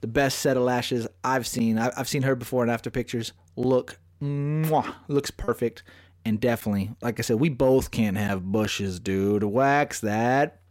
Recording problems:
choppy; occasionally; at 5.5 s; 4% of the speech affected

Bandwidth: 16 kHz